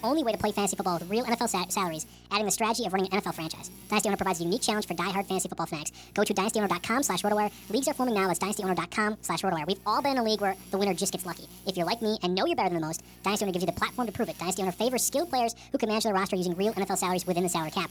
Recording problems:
wrong speed and pitch; too fast and too high; 1.5 times normal speed
electrical hum; faint; throughout; 60 Hz, 25 dB below the speech

